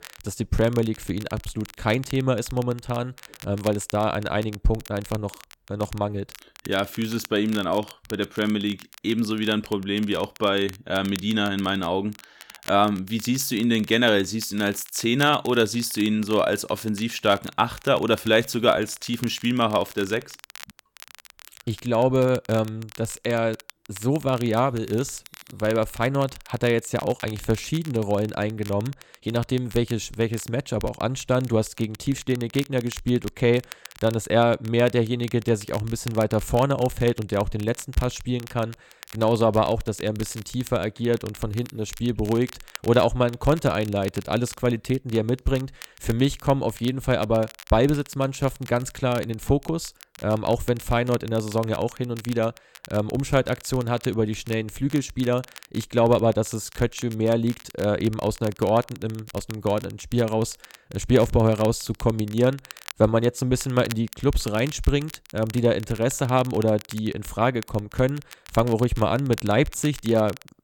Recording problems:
crackle, like an old record; noticeable; 20 dB below the speech

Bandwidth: 17.5 kHz